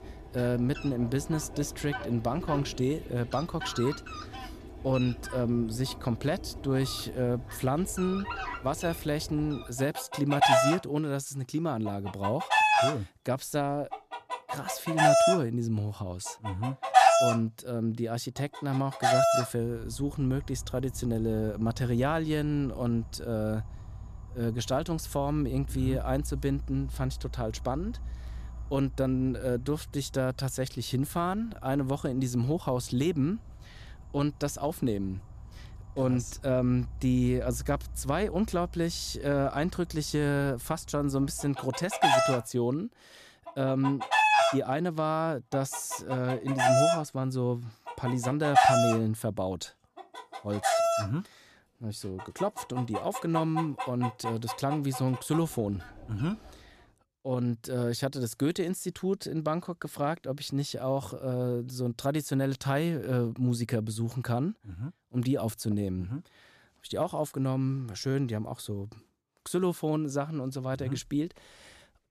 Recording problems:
animal sounds; very loud; until 57 s; 1 dB above the speech

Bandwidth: 14.5 kHz